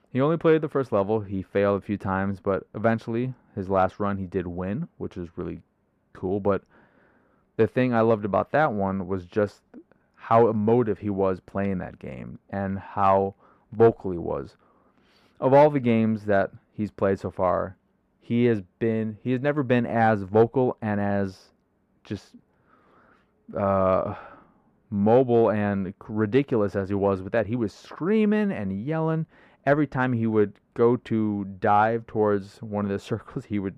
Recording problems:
muffled; very; fading above 2.5 kHz

